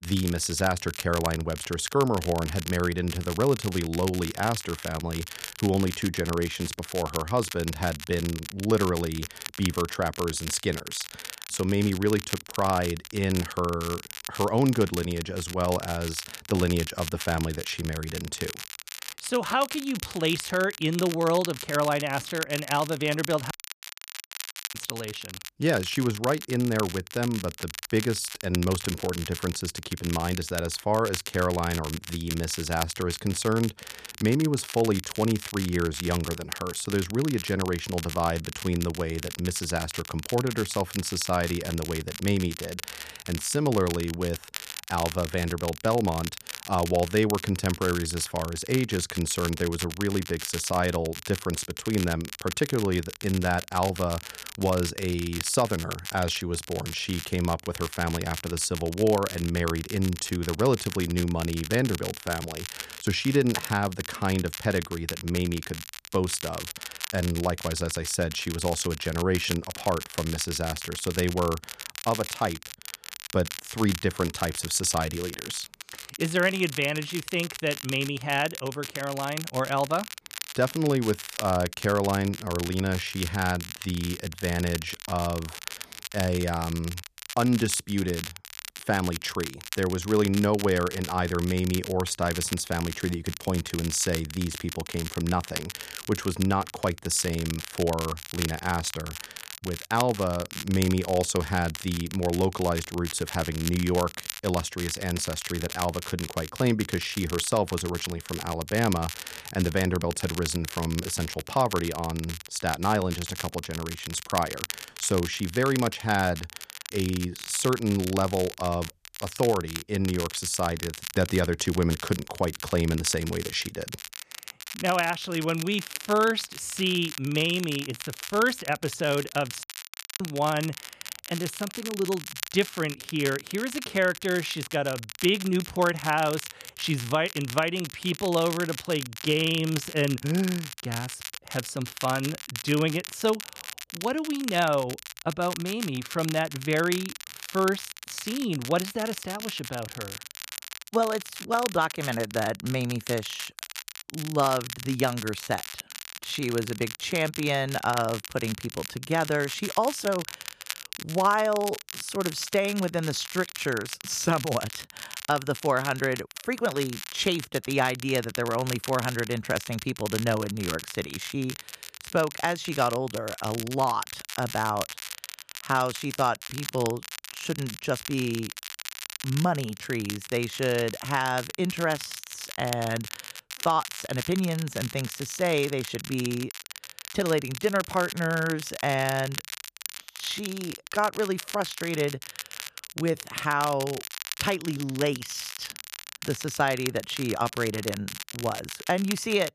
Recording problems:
crackle, like an old record; loud; 9 dB below the speech
audio cutting out; at 24 s for 1 s and at 2:10 for 0.5 s

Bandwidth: 14.5 kHz